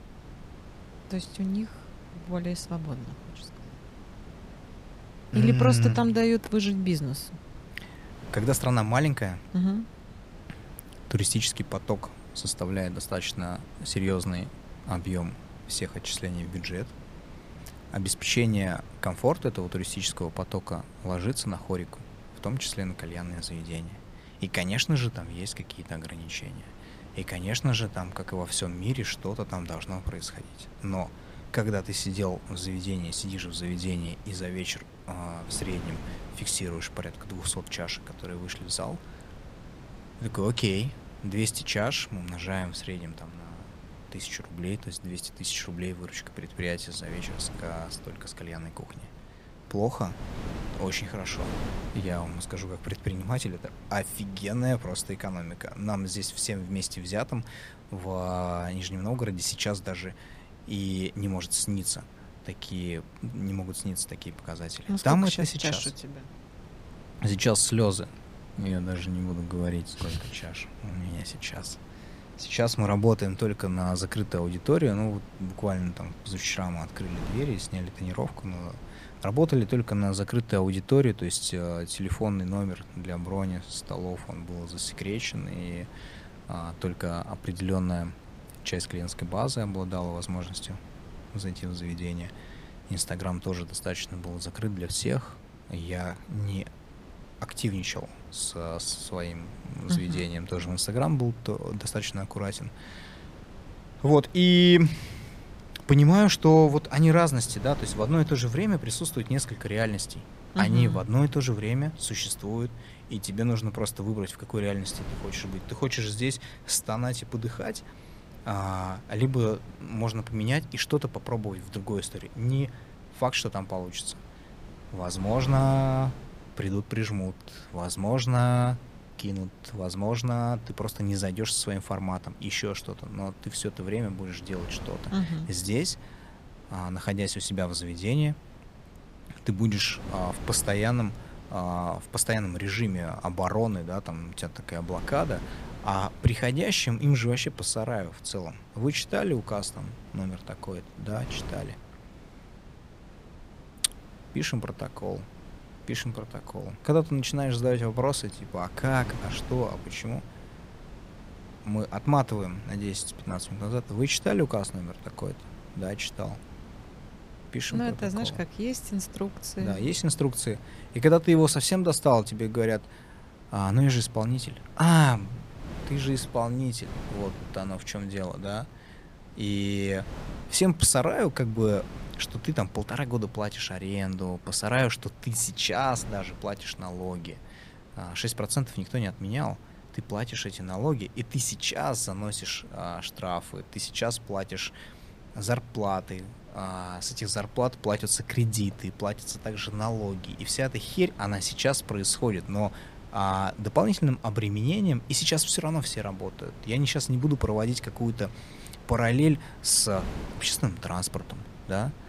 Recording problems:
wind noise on the microphone; occasional gusts; 20 dB below the speech

